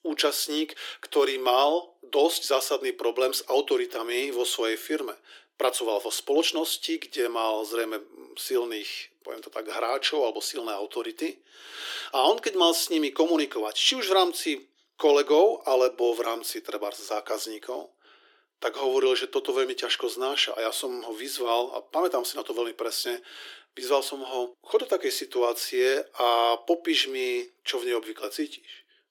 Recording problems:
thin; very; fading below 300 Hz

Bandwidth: 18 kHz